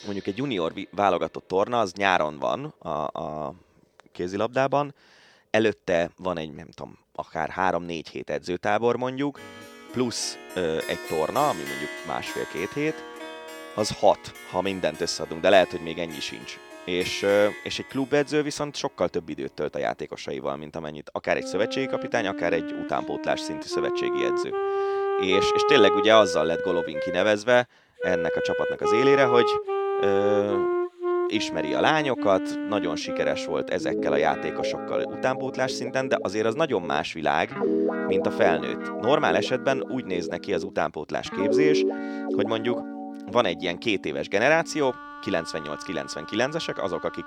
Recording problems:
background music; loud; throughout; 3 dB below the speech

